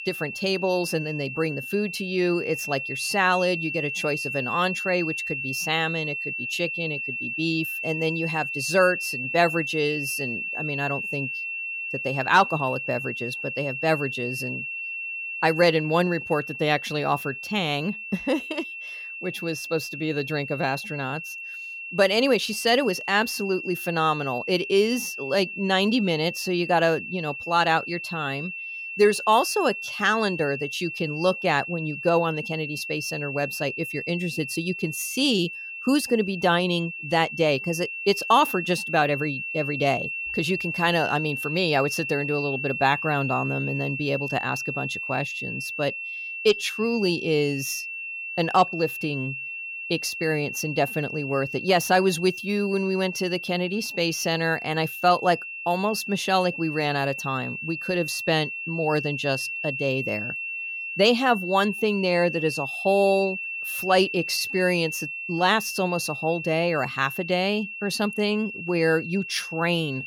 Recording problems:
high-pitched whine; loud; throughout; 2.5 kHz, 6 dB below the speech

